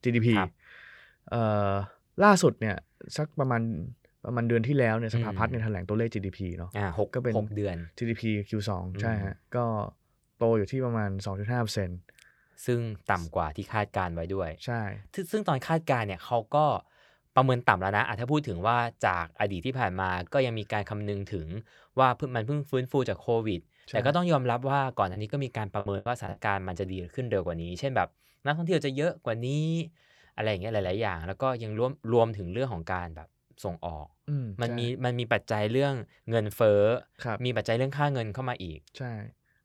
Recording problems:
choppy; very; from 25 to 26 s; 10% of the speech affected

